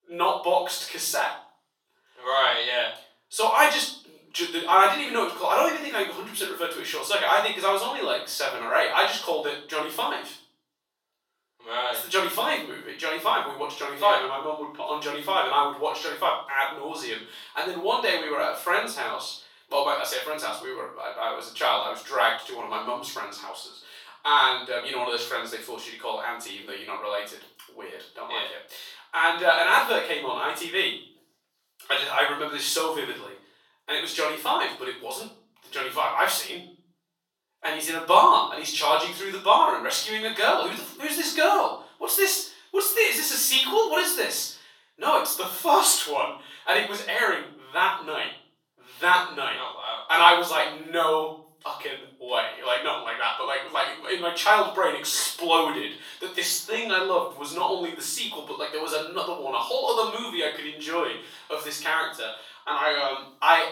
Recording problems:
off-mic speech; far
thin; very; fading below 700 Hz
room echo; noticeable; dies away in 0.5 s

